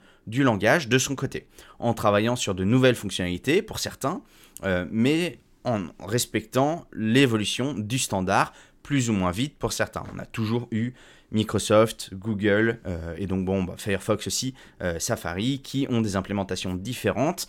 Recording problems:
none

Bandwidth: 16.5 kHz